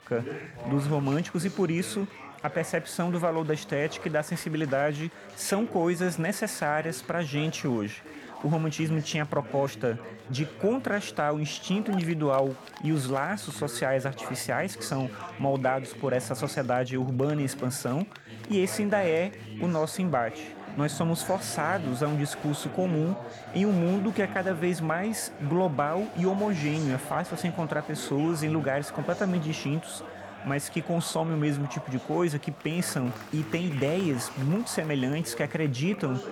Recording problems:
chatter from many people; noticeable; throughout; 15 dB below the speech

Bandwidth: 17.5 kHz